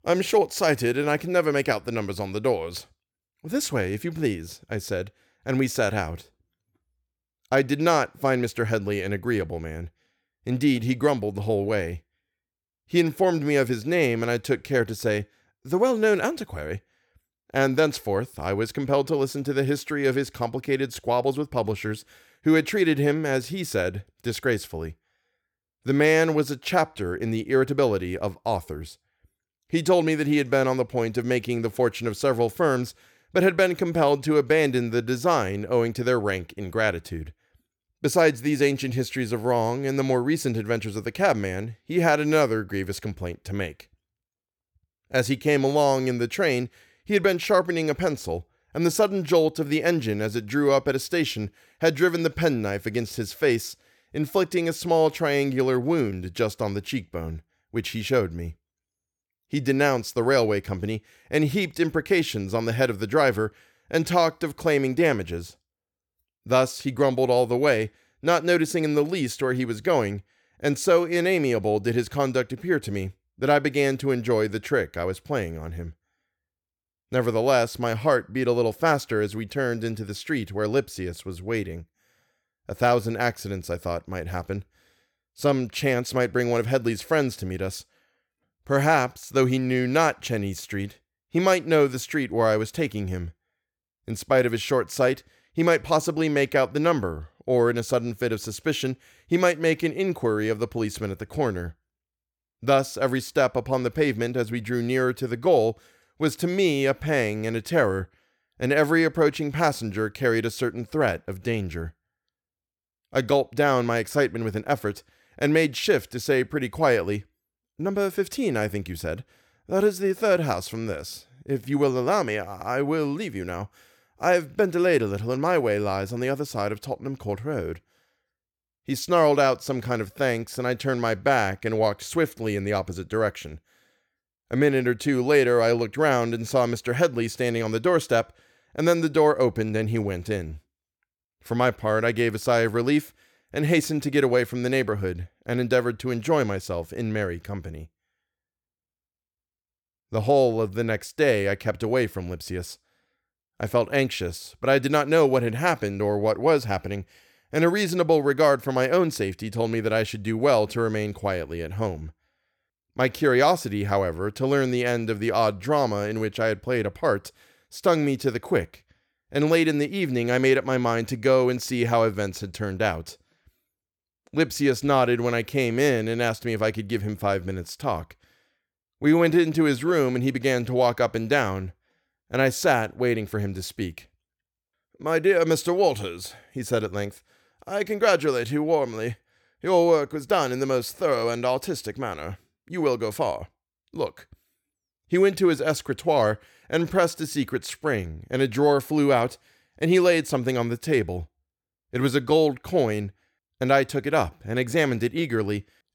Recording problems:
none

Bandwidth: 18.5 kHz